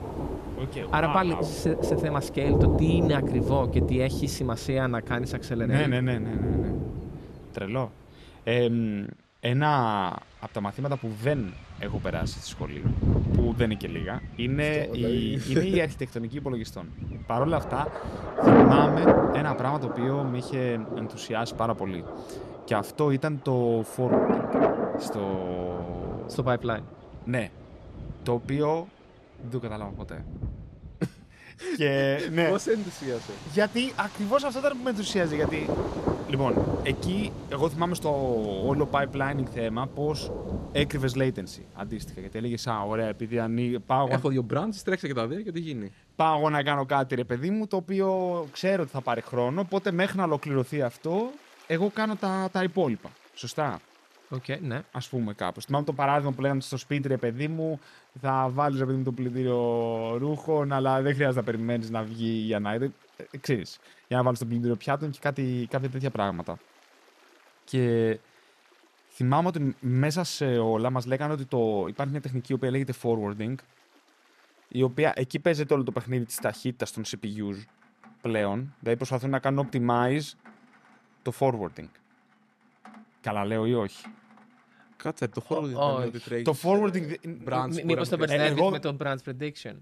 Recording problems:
rain or running water; loud; throughout; 2 dB below the speech

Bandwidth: 13.5 kHz